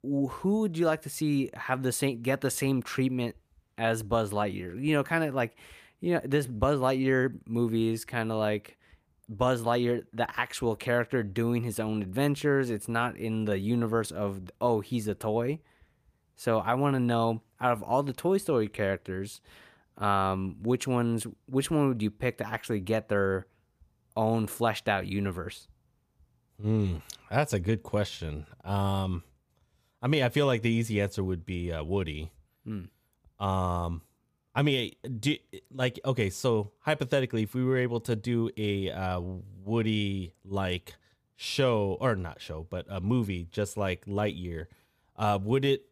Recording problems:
none

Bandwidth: 15 kHz